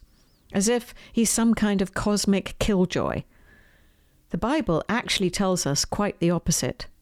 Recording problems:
none

